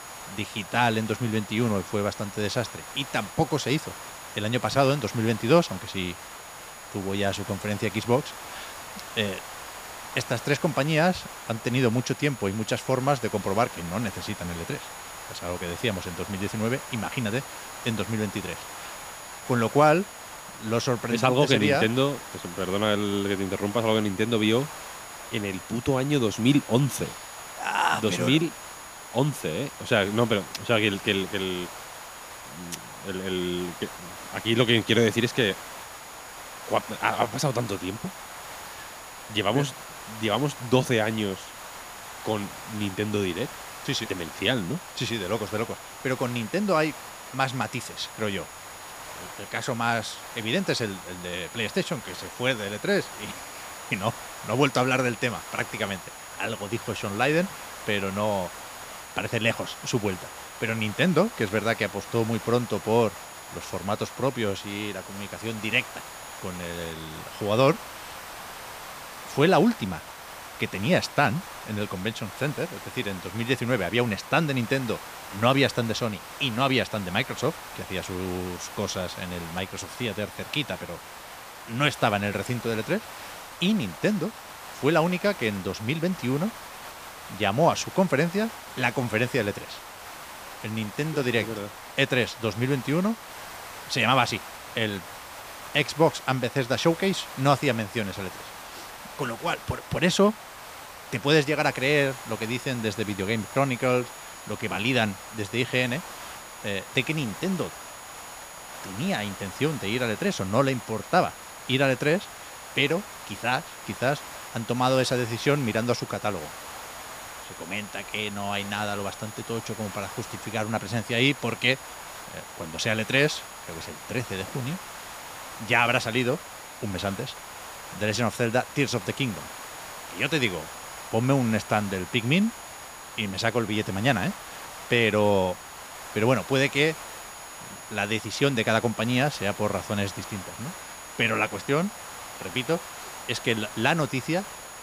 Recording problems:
hiss; noticeable; throughout; 15 dB below the speech
high-pitched whine; faint; until 1:07 and from 1:42 on; 7 kHz, 20 dB below the speech

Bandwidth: 15 kHz